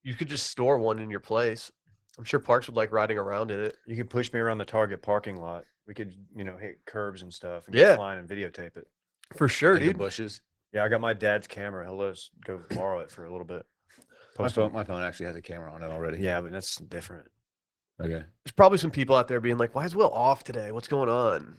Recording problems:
garbled, watery; slightly; nothing above 17.5 kHz

